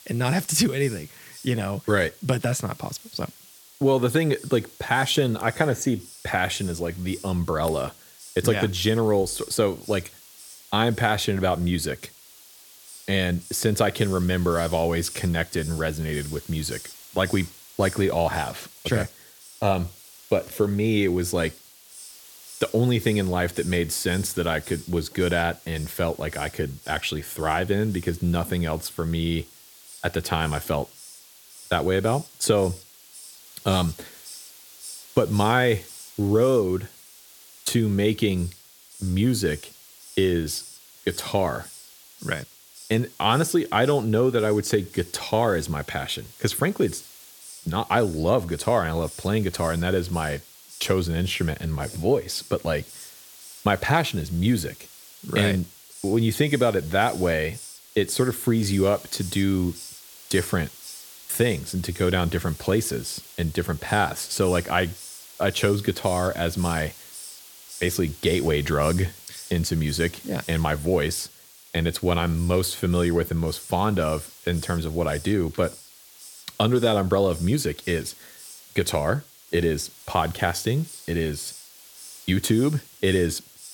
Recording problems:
hiss; noticeable; throughout; 15 dB below the speech

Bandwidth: 17.5 kHz